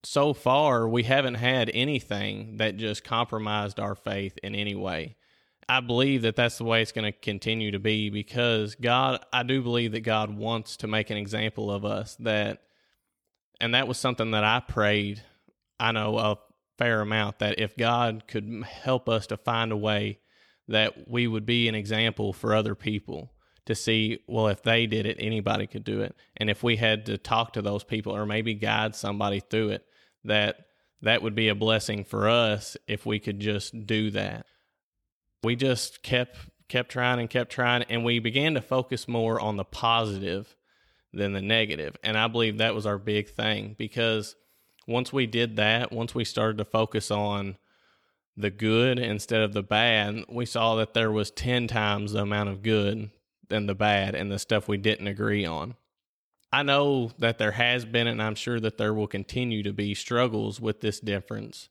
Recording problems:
none

